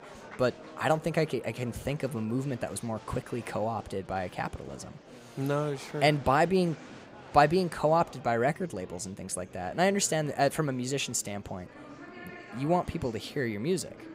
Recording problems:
murmuring crowd; noticeable; throughout; 20 dB below the speech

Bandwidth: 15.5 kHz